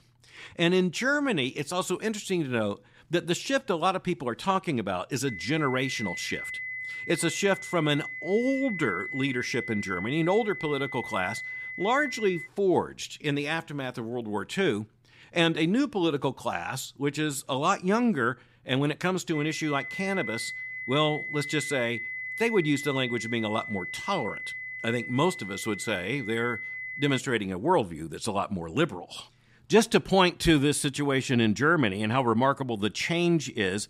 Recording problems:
high-pitched whine; loud; from 5.5 to 12 s and from 19 to 27 s; 2 kHz, 8 dB below the speech

